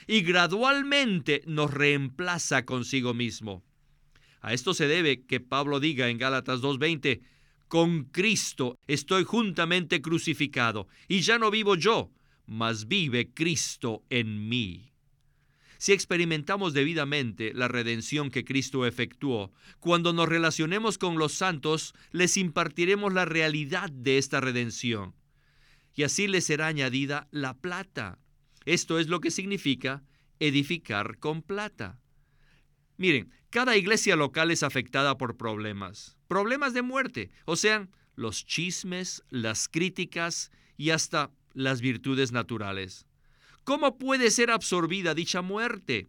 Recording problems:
none

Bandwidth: 18.5 kHz